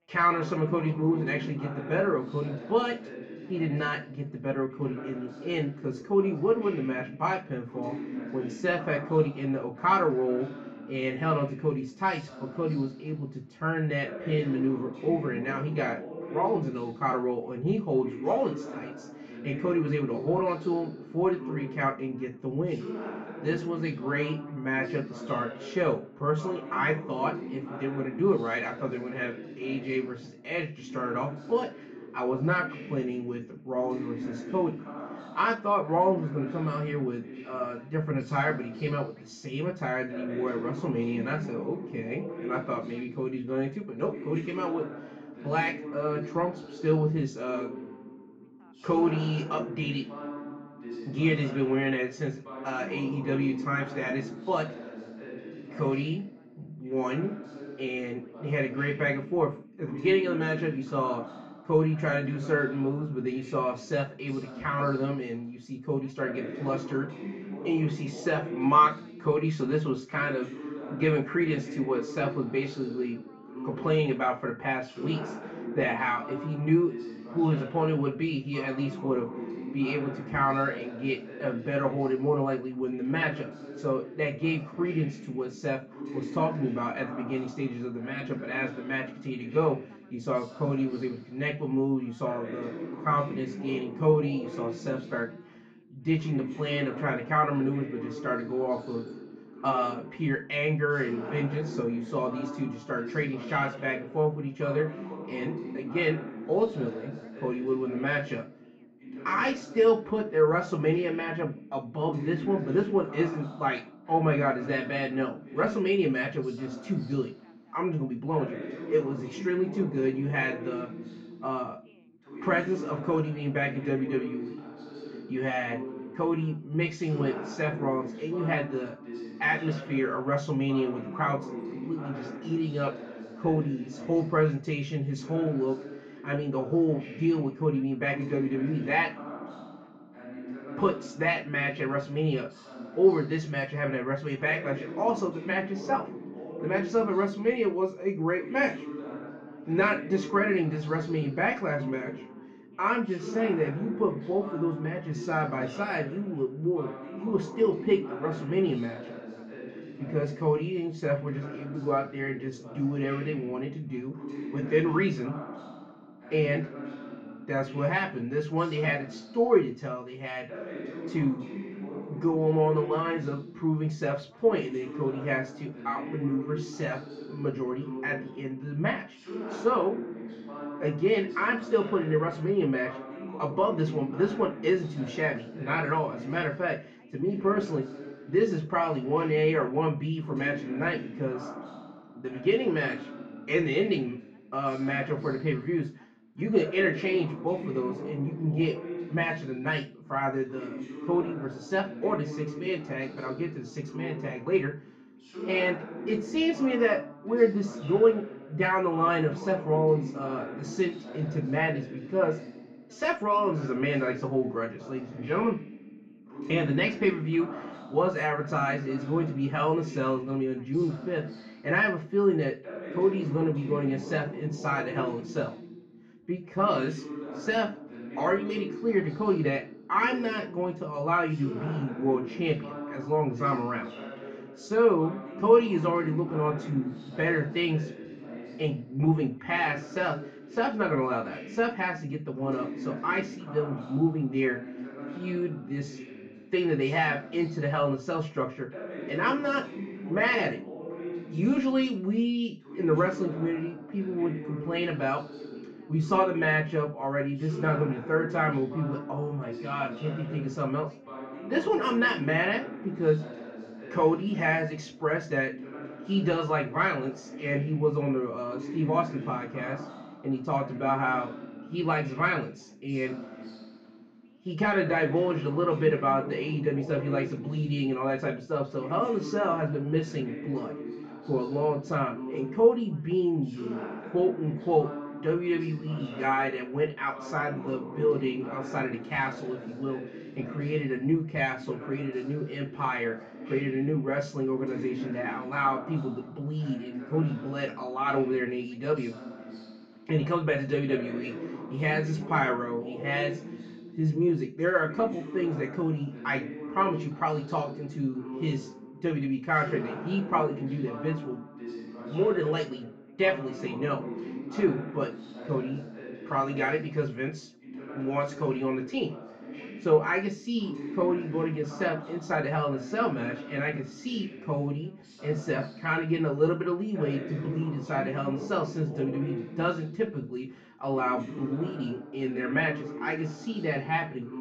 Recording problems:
off-mic speech; far
muffled; slightly; fading above 2.5 kHz
room echo; slight; dies away in 0.3 s
background chatter; noticeable; throughout; 2 voices, 10 dB below the speech

